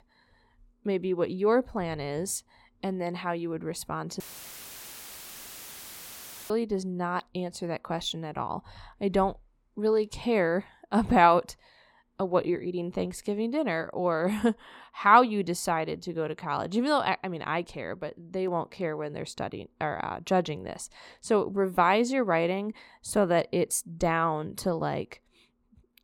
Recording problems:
audio cutting out; filled with static; at 4 s for 2.5 s

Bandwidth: 16.5 kHz